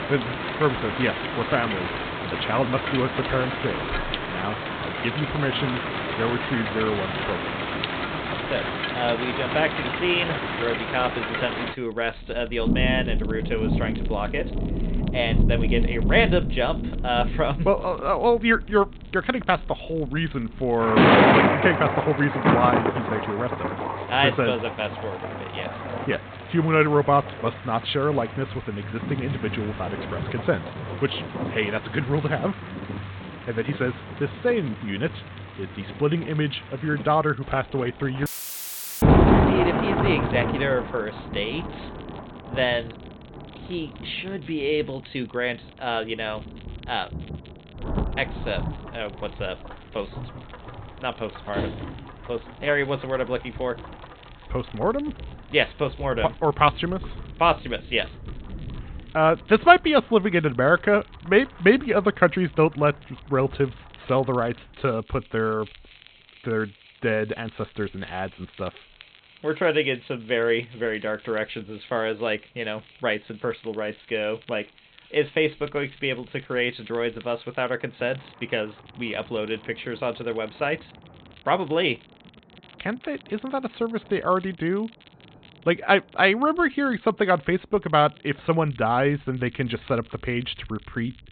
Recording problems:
high frequencies cut off; severe; nothing above 4 kHz
rain or running water; loud; throughout; 2 dB below the speech
crackle, like an old record; faint; 25 dB below the speech
audio cutting out; filled with static; at 38 s for 1 s
door banging; noticeable; at 52 s; peak 6 dB below the speech

